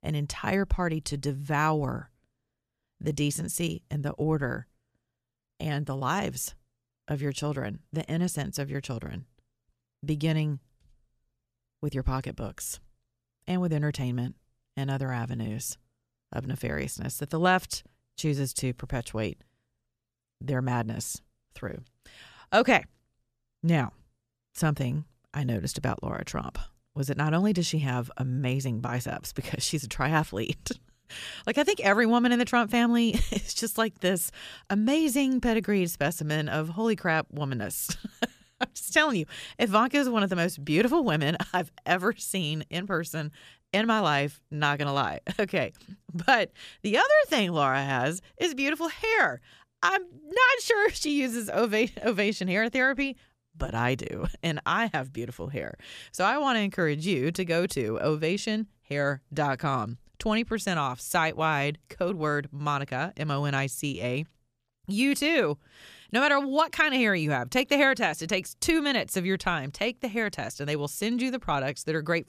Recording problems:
none

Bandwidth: 14.5 kHz